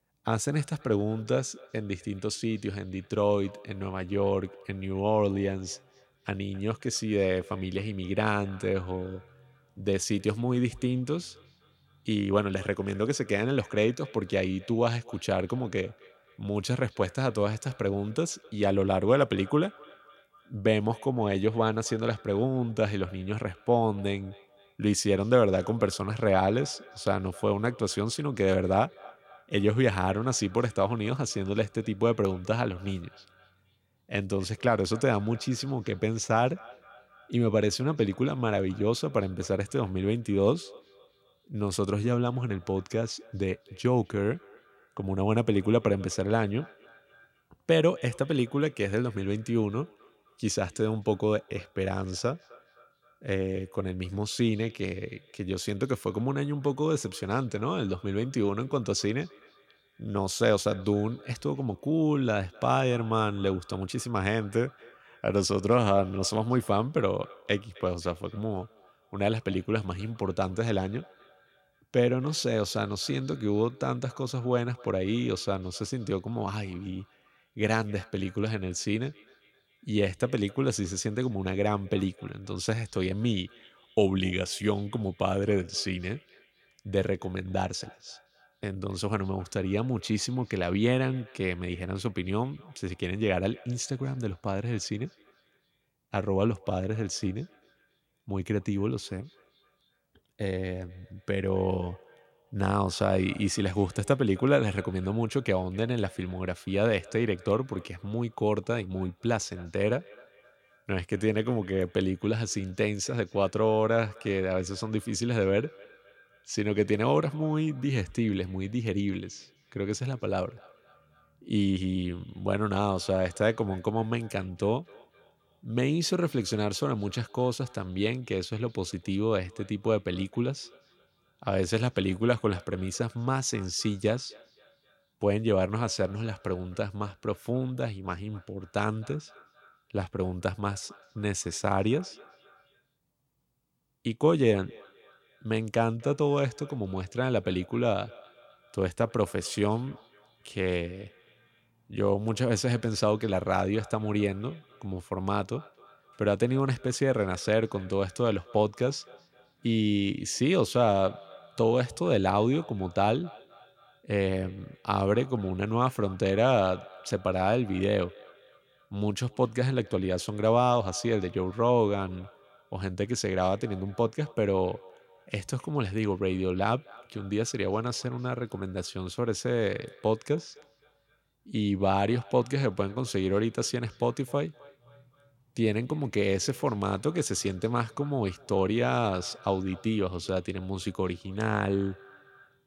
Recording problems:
echo of what is said; faint; throughout; 260 ms later, 25 dB below the speech

